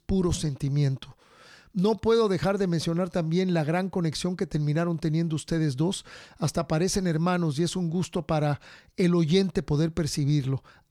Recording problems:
none

